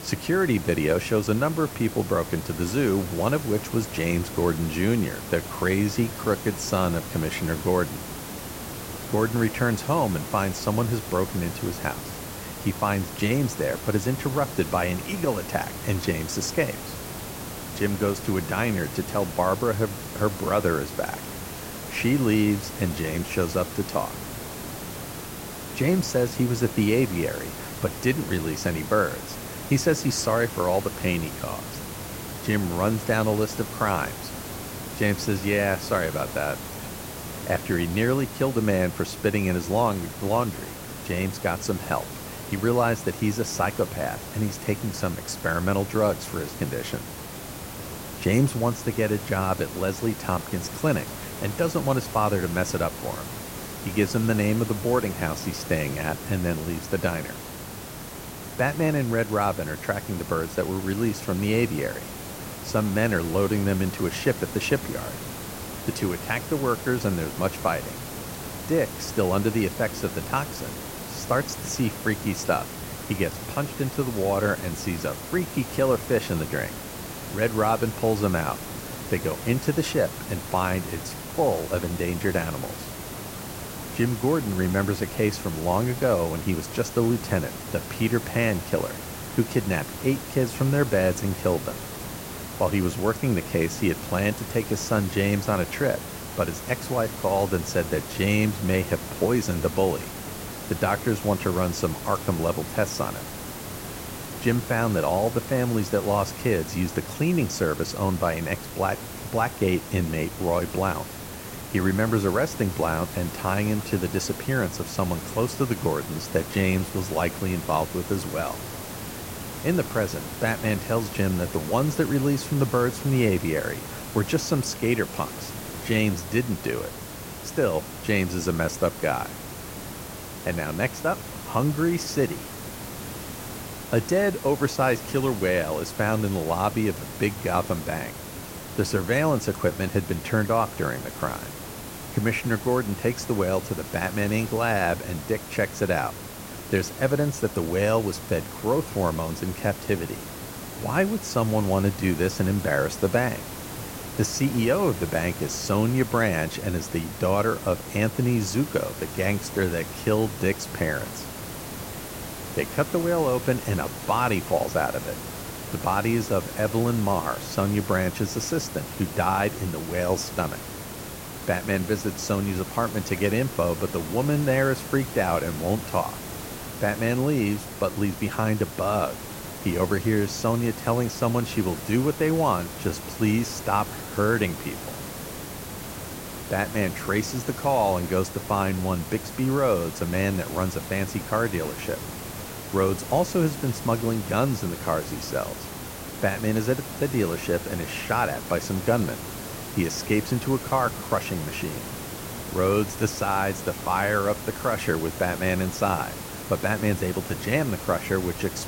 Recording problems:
hiss; loud; throughout; 9 dB below the speech

